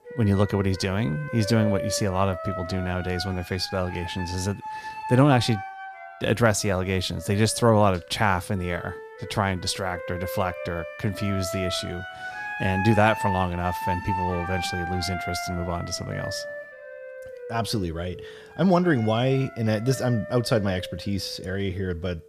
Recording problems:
background music; loud; throughout; 9 dB below the speech

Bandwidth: 14.5 kHz